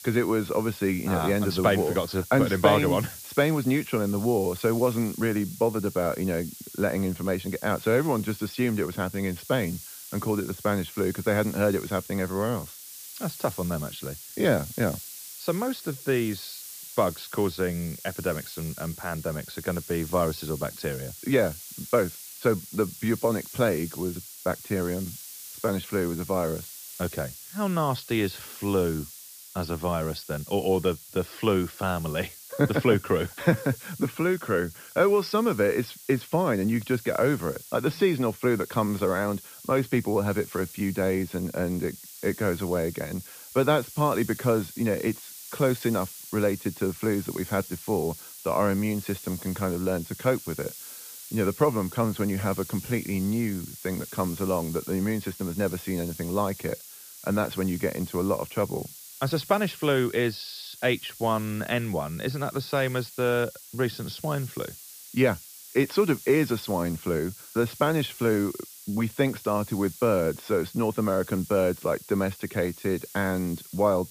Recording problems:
high frequencies cut off; noticeable; nothing above 5.5 kHz
hiss; noticeable; throughout; 15 dB below the speech

